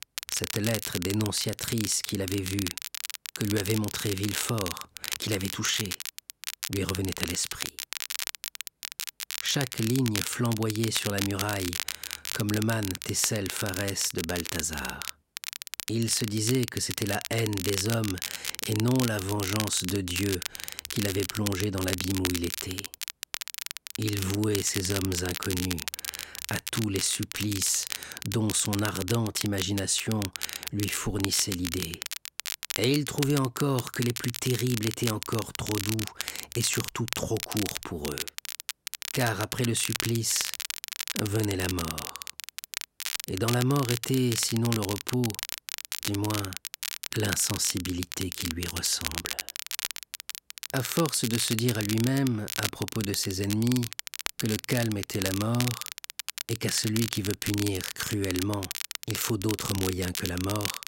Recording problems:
crackle, like an old record; loud; 5 dB below the speech

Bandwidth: 16 kHz